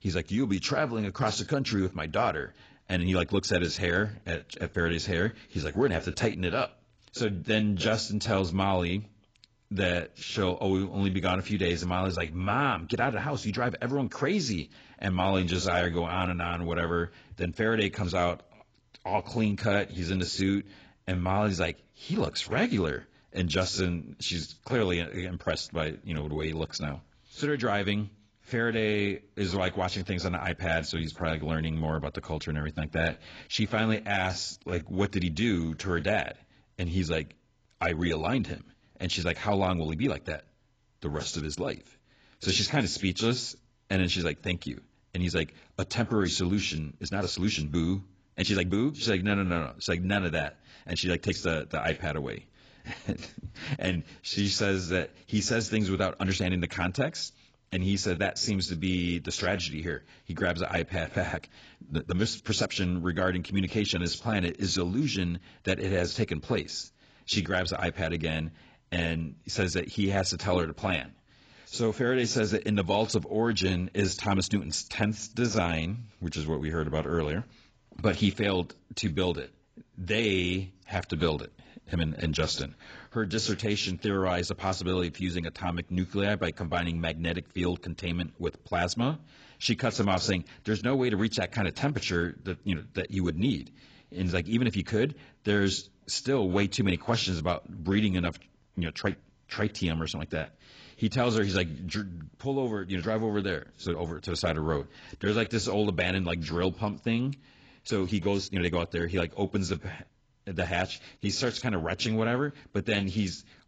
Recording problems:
garbled, watery; badly; nothing above 7.5 kHz
uneven, jittery; strongly; from 7.5 s to 1:53

